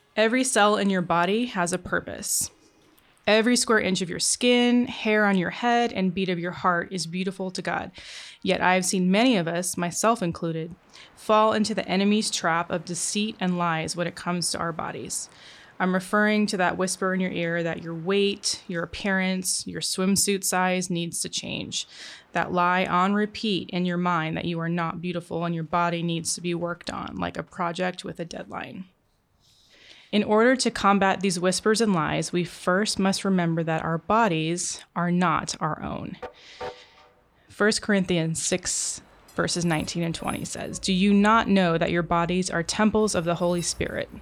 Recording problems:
train or aircraft noise; faint; throughout; 25 dB below the speech

